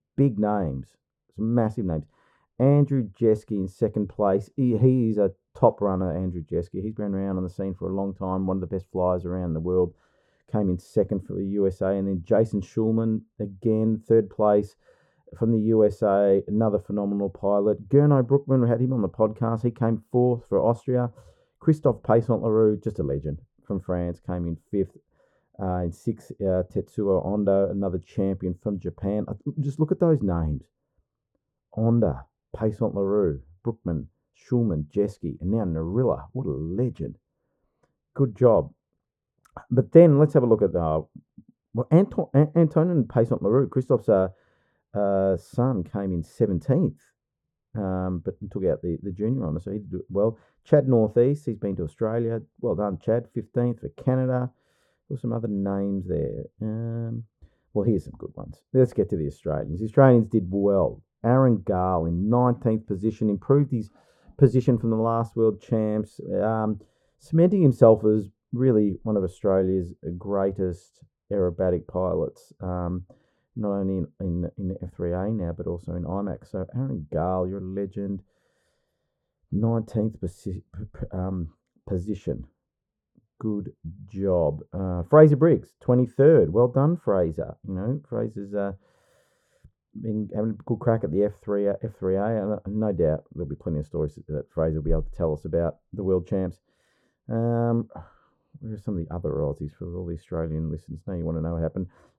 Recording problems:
muffled; very; fading above 2 kHz

